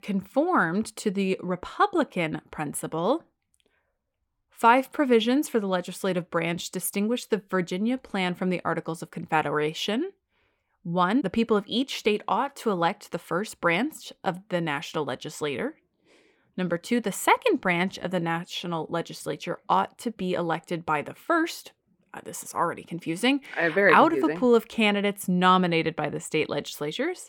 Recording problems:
none

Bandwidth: 17.5 kHz